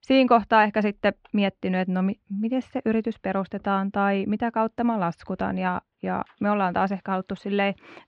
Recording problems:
muffled; slightly; fading above 3 kHz

